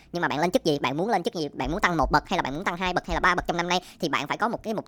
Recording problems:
wrong speed and pitch; too fast and too high; 1.5 times normal speed

